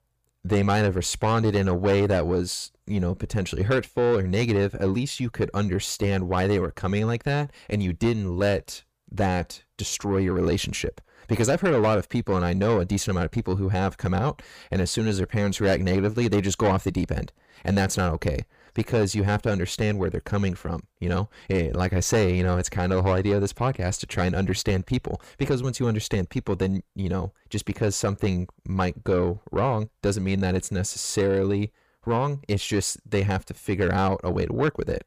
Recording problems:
distortion; slight; 10 dB below the speech

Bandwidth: 15 kHz